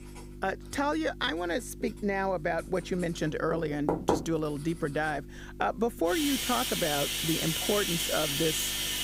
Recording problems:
household noises; very loud; throughout; 1 dB above the speech
electrical hum; faint; throughout; 50 Hz, 20 dB below the speech

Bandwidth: 15.5 kHz